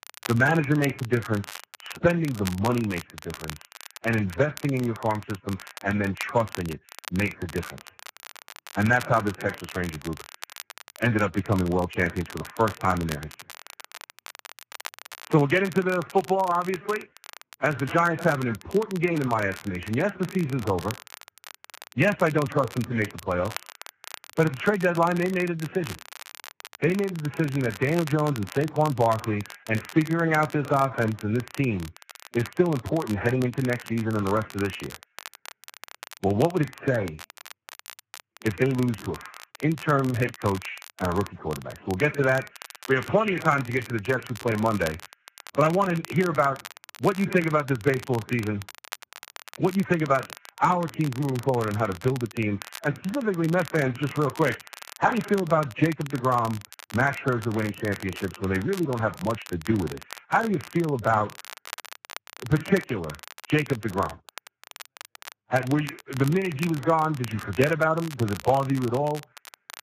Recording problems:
garbled, watery; badly; nothing above 7.5 kHz
crackle, like an old record; noticeable; 15 dB below the speech

